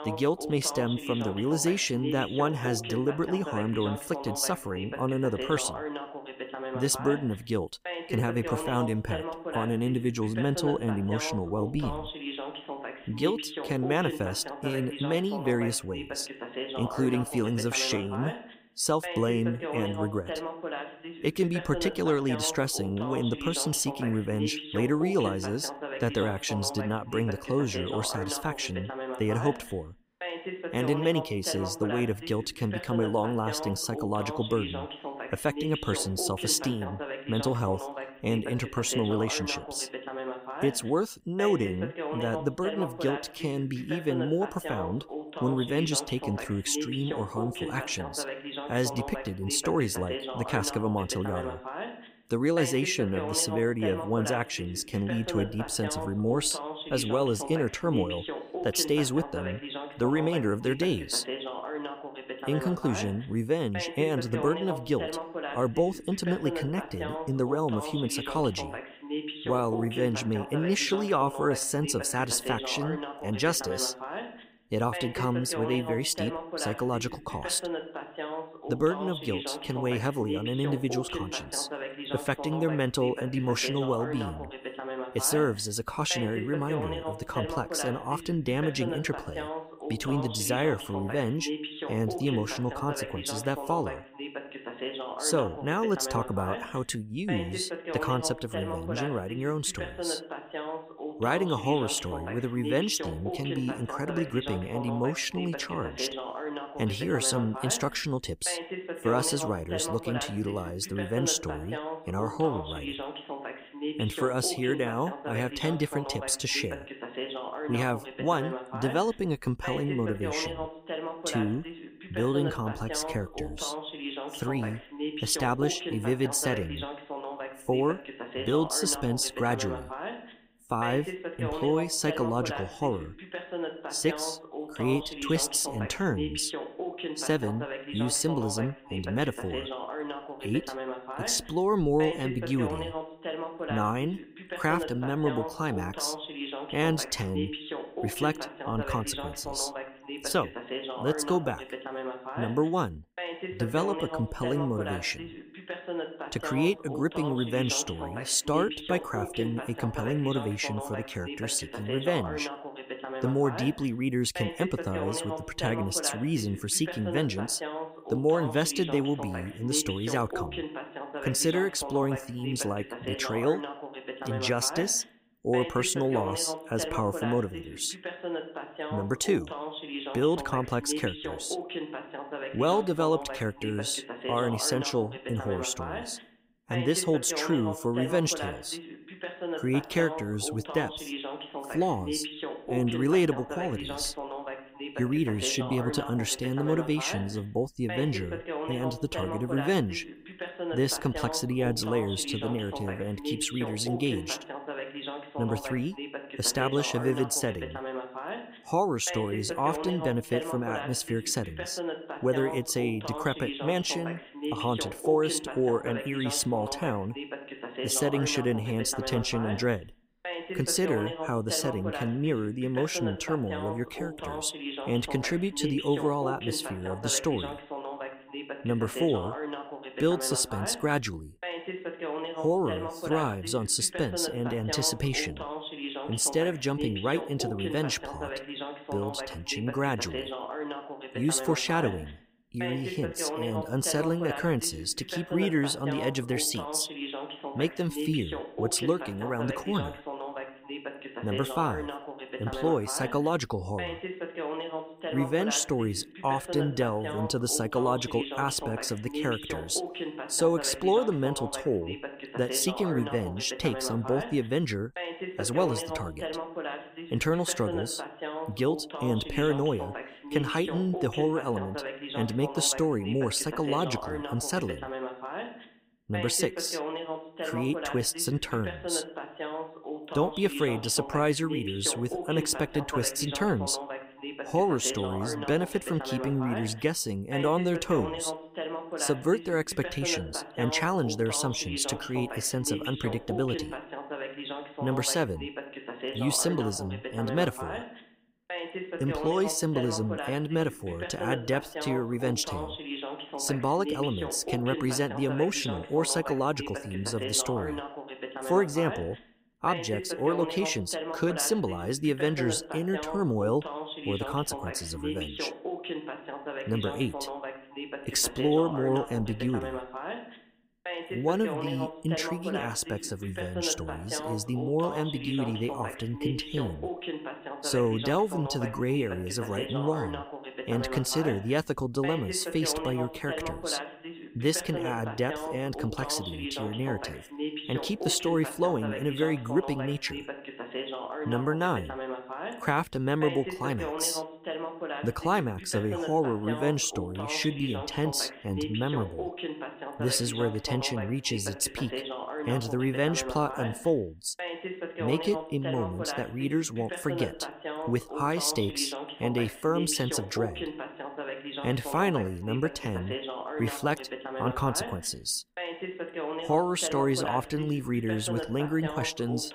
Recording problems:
voice in the background; loud; throughout; 7 dB below the speech

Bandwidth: 15.5 kHz